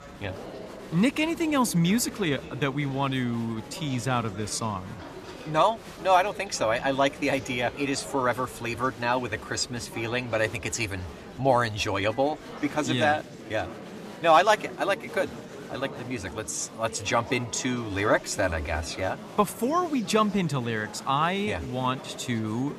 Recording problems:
murmuring crowd; noticeable; throughout; 15 dB below the speech

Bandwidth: 14.5 kHz